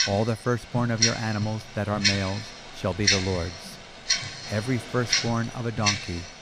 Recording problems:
household noises; very loud; throughout; 2 dB above the speech

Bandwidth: 15 kHz